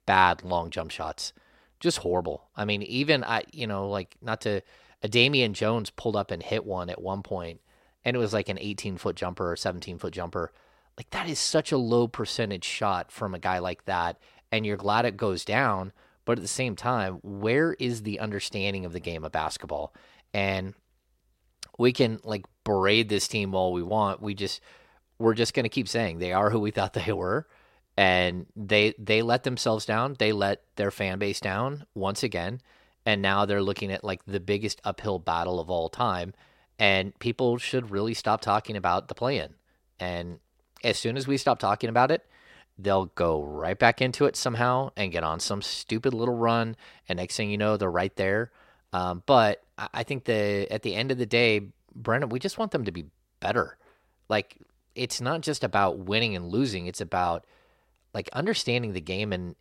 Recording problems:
none

